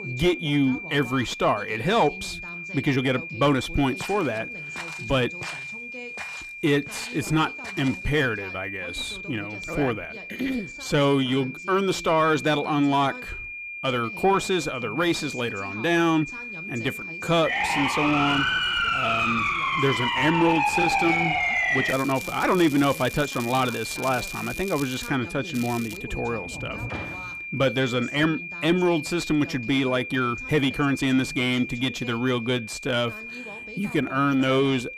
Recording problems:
distortion; slight; 10 dB below the speech
high-pitched whine; loud; throughout; 2.5 kHz, 9 dB below the speech
voice in the background; noticeable; throughout; 20 dB below the speech
crackling; noticeable; from 22 to 25 s and at 26 s; 15 dB below the speech
uneven, jittery; strongly; from 2.5 to 34 s
footsteps; faint; from 4 to 8 s; peak 15 dB below the speech
siren; loud; from 17 to 22 s; peak 4 dB above the speech
door banging; noticeable; from 26 to 27 s; peak 10 dB below the speech

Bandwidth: 15 kHz